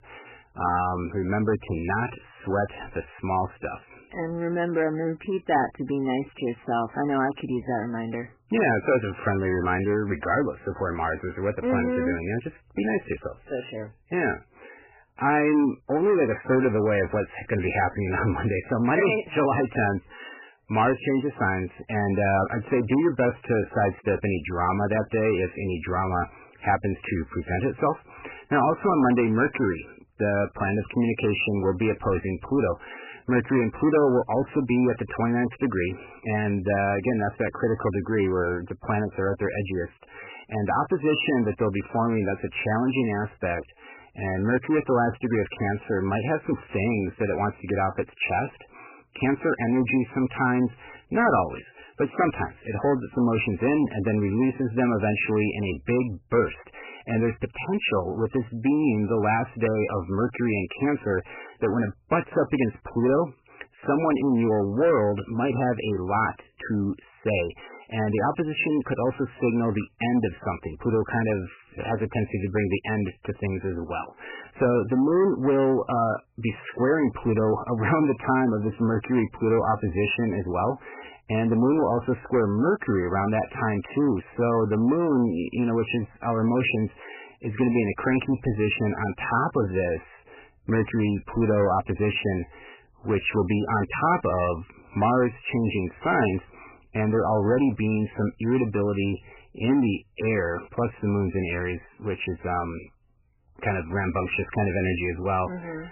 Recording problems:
garbled, watery; badly; nothing above 3 kHz
distortion; slight; 10 dB below the speech

